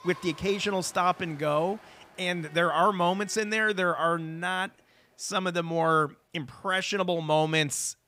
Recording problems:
crowd noise; faint; throughout; 25 dB below the speech

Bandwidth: 15.5 kHz